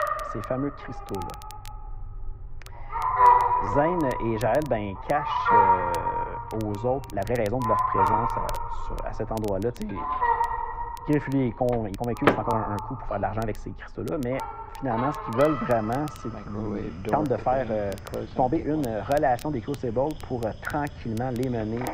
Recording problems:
muffled; very; fading above 3 kHz
animal sounds; very loud; throughout; 2 dB above the speech
household noises; loud; throughout; 5 dB below the speech
crackle, like an old record; faint; 20 dB below the speech
uneven, jittery; strongly; from 1 to 21 s

